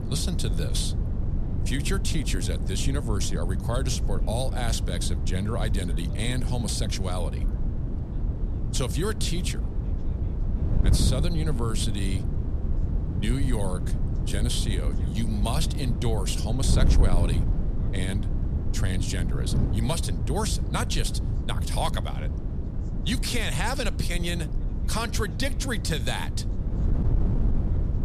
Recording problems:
wind noise on the microphone; heavy; 9 dB below the speech
voice in the background; faint; throughout; 25 dB below the speech

